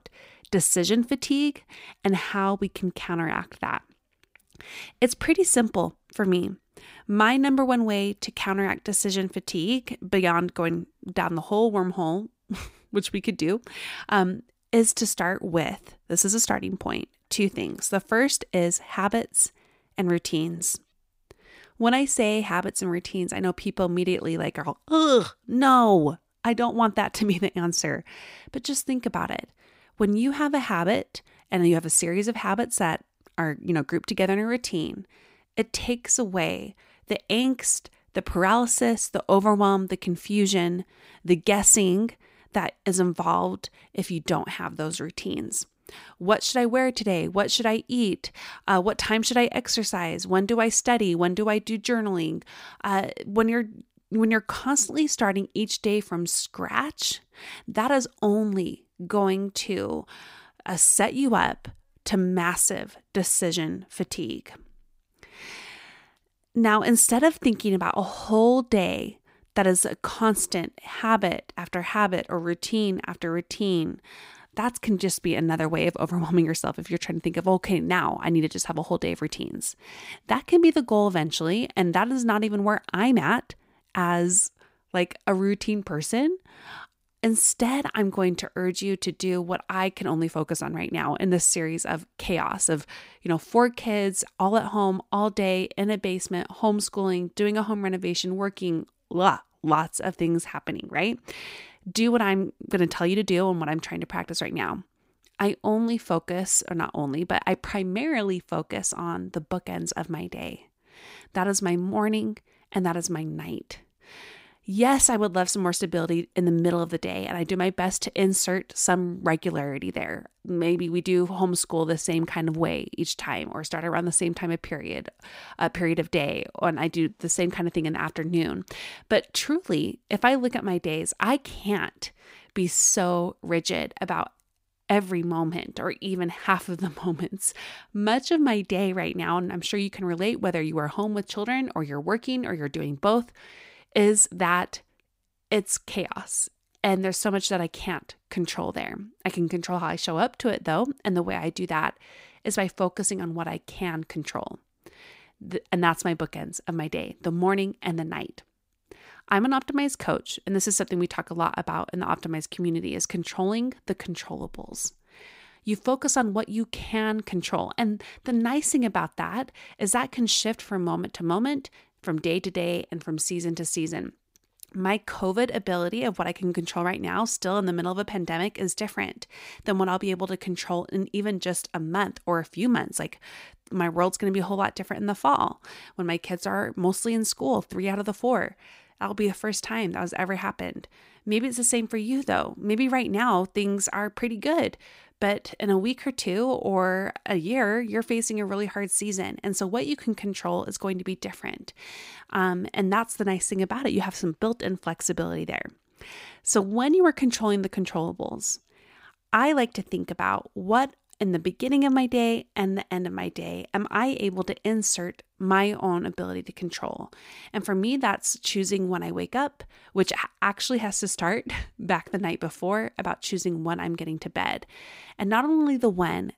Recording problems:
none

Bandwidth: 15.5 kHz